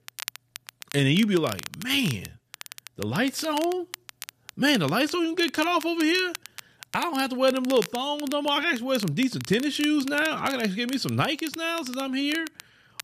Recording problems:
crackle, like an old record; noticeable; 15 dB below the speech

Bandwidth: 14.5 kHz